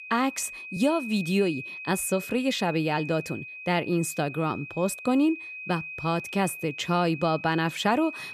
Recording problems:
high-pitched whine; noticeable; throughout; 2.5 kHz, 10 dB below the speech

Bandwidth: 14.5 kHz